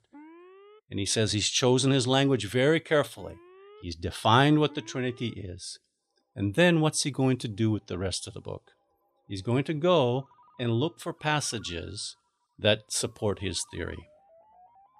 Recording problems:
alarms or sirens; faint; throughout; 30 dB below the speech

